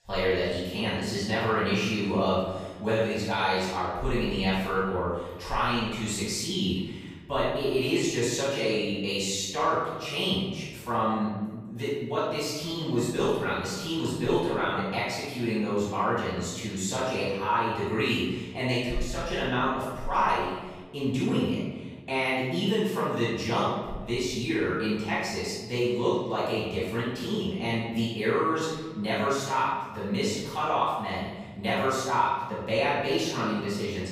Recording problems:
room echo; strong; dies away in 1.3 s
off-mic speech; far

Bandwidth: 15 kHz